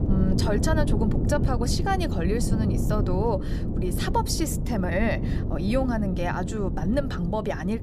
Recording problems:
wind noise on the microphone; heavy; 7 dB below the speech

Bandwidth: 14.5 kHz